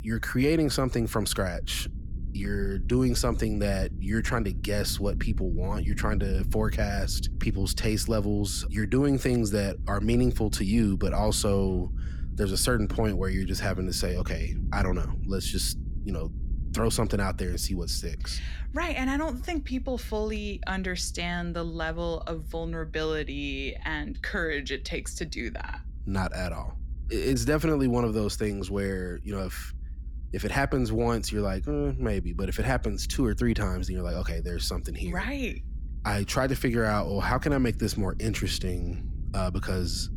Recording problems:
low rumble; faint; throughout; 20 dB below the speech

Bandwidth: 17.5 kHz